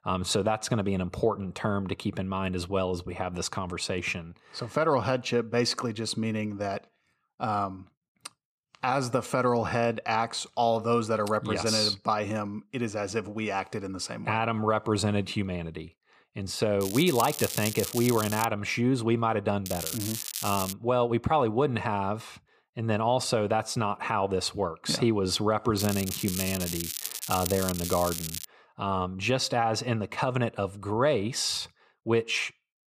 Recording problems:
crackling; loud; from 17 to 18 s, from 20 to 21 s and from 26 to 28 s; 5 dB below the speech

